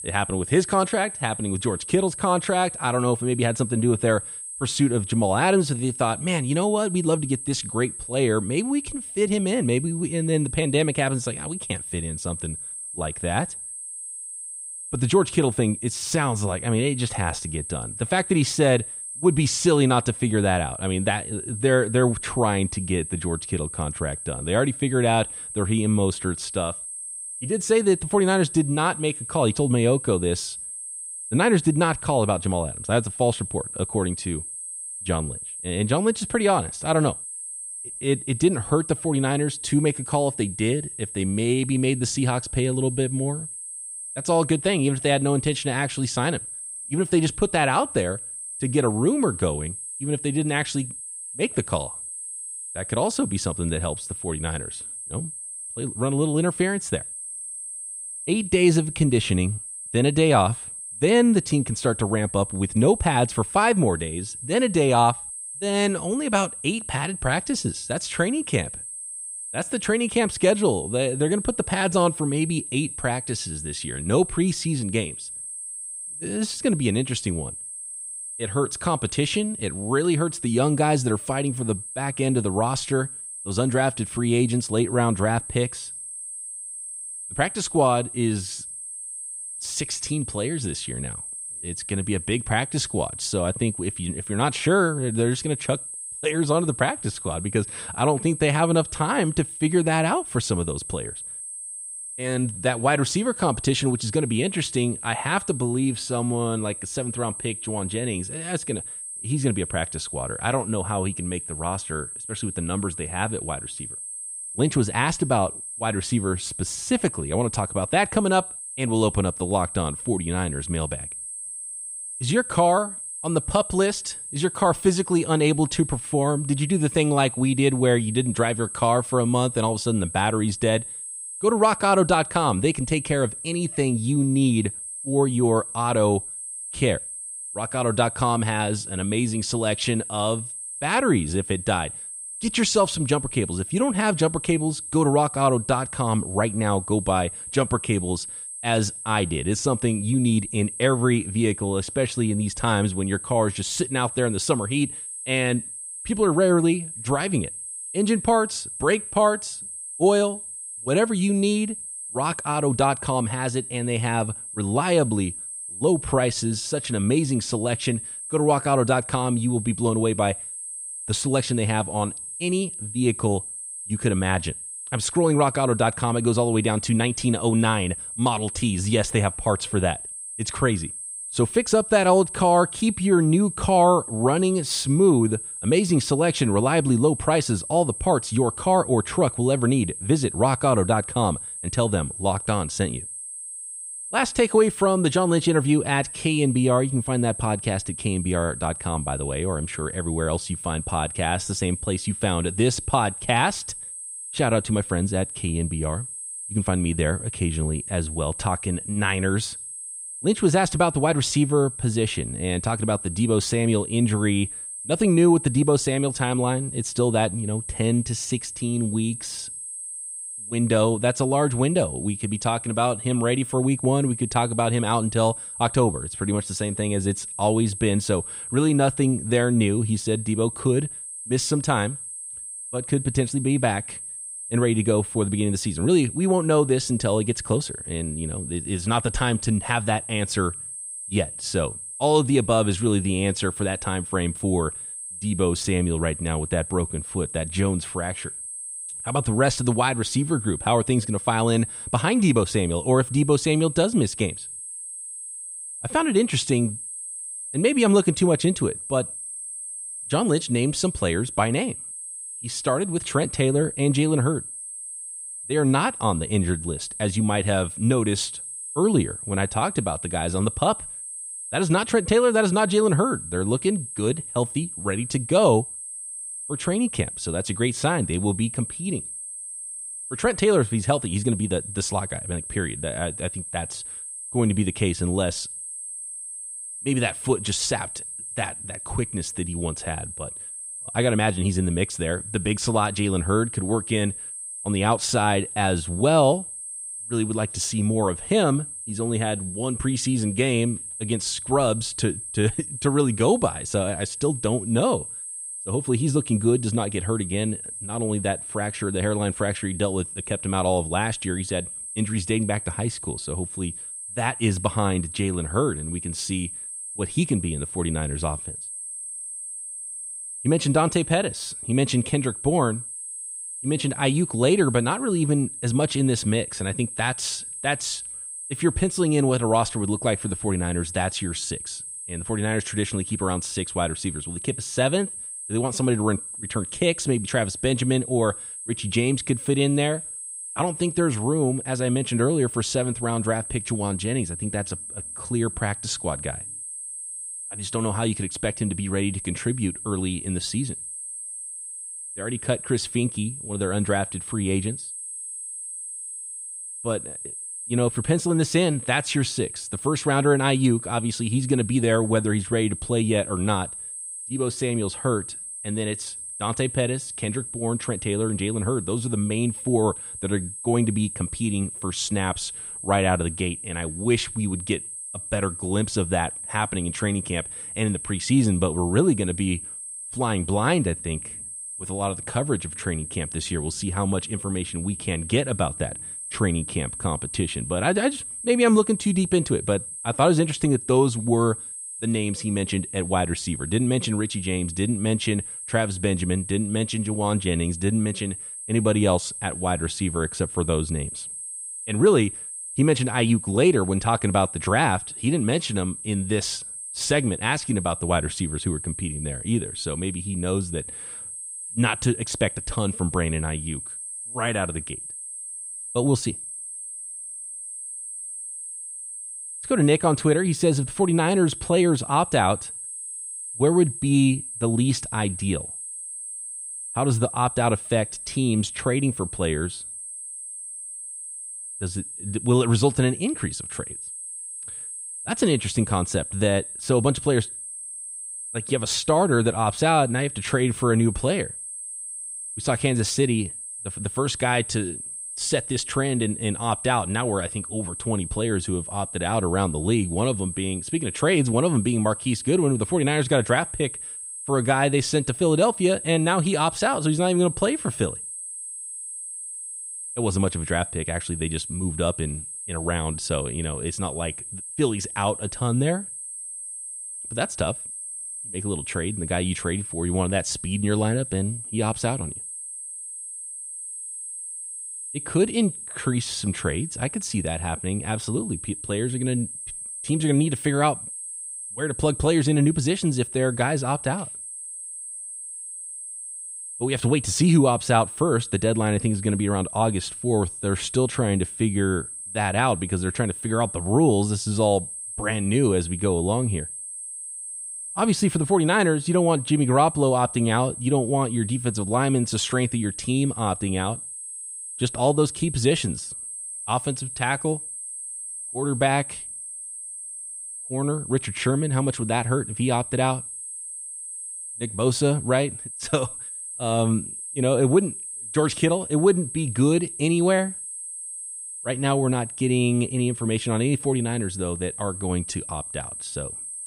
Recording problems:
high-pitched whine; loud; throughout; 8.5 kHz, 8 dB below the speech

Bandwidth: 15.5 kHz